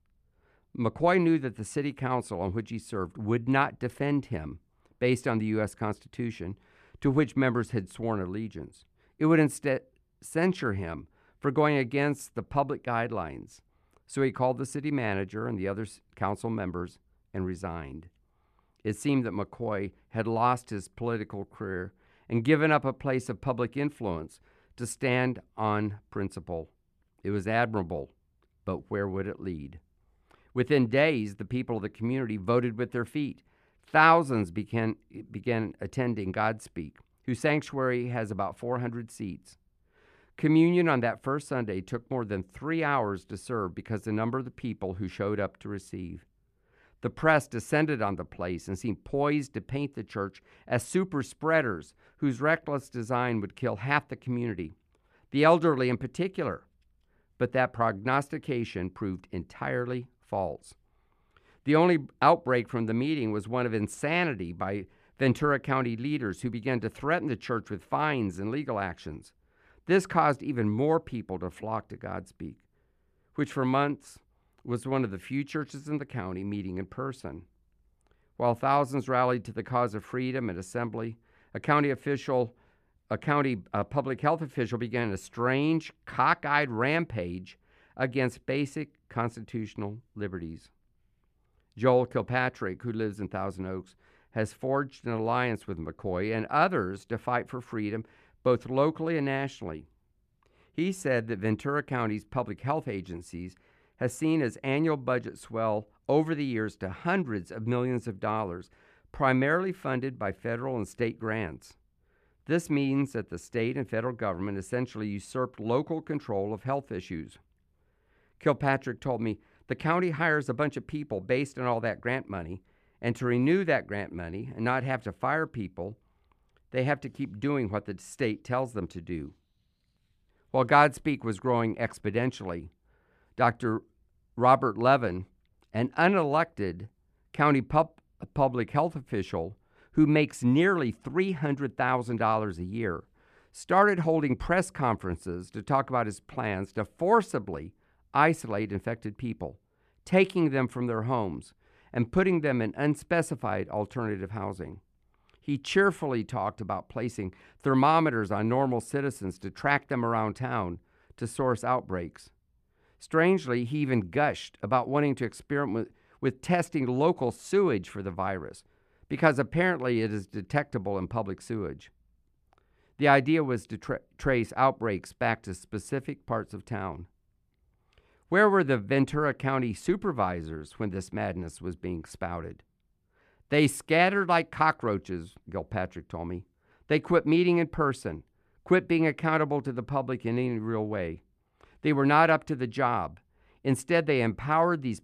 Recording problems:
none

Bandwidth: 14.5 kHz